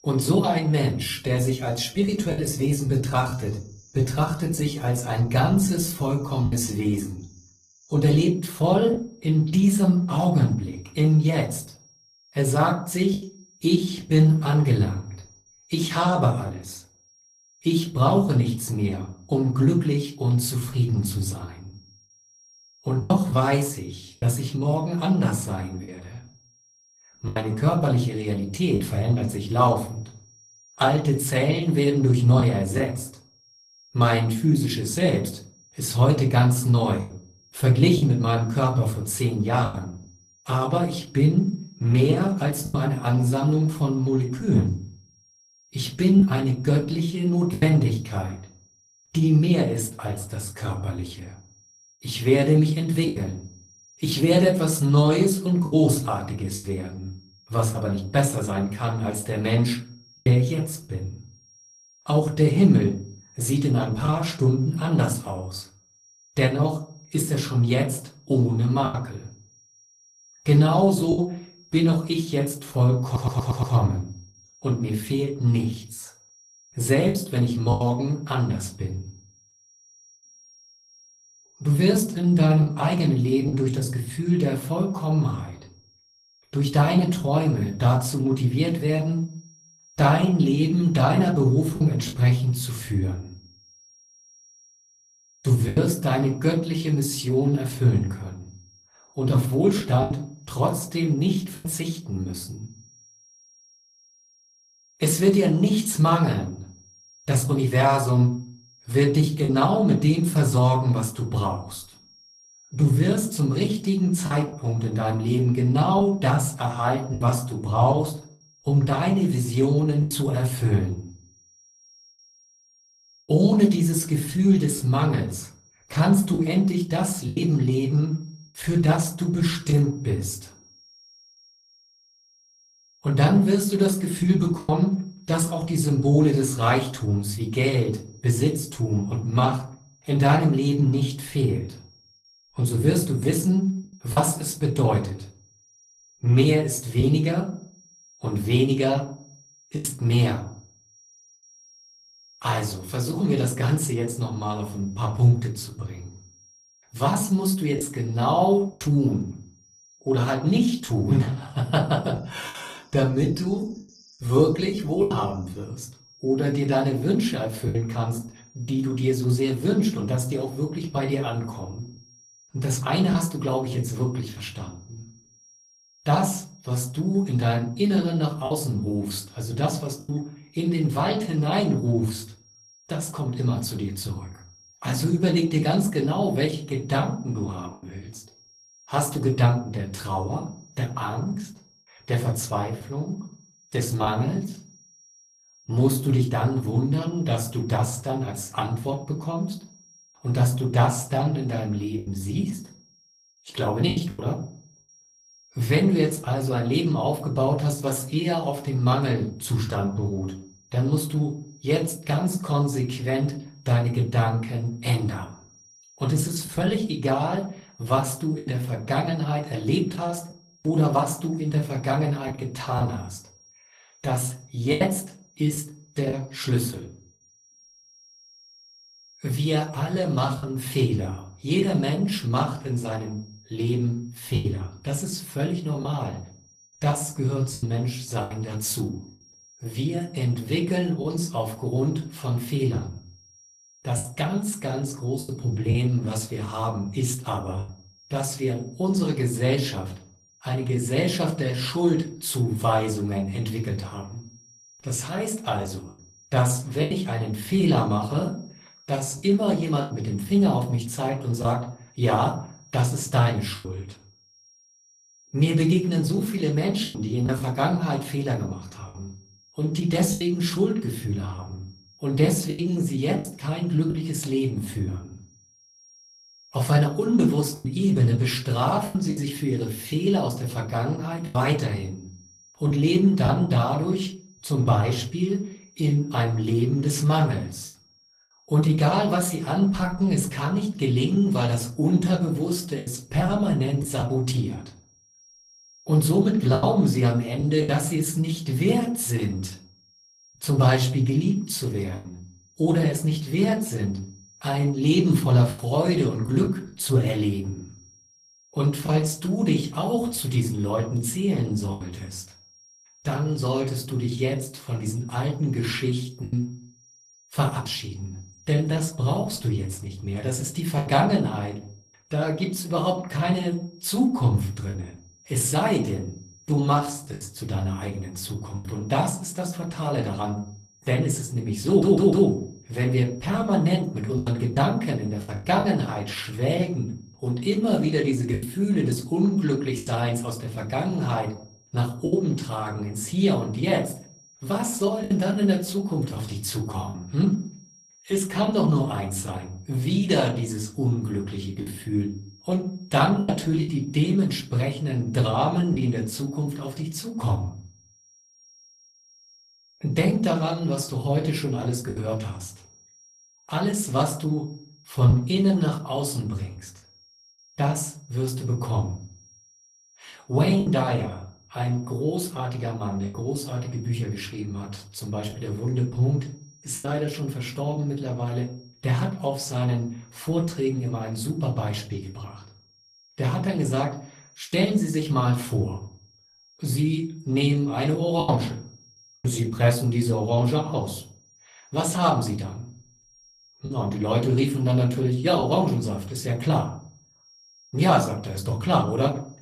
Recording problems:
room echo; very slight; dies away in 0.4 s
off-mic speech; somewhat distant
garbled, watery; slightly; nothing above 14.5 kHz
high-pitched whine; faint; throughout; 5.5 kHz, 30 dB below the speech
choppy; occasionally; 3% of the speech affected
audio stuttering; at 1:13 and at 5:32

